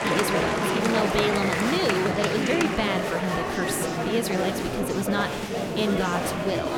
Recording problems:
murmuring crowd; very loud; throughout; 1 dB above the speech

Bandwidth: 17 kHz